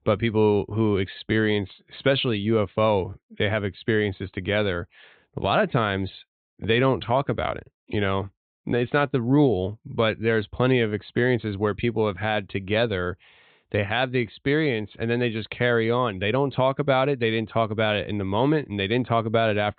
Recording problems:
high frequencies cut off; severe; nothing above 4 kHz

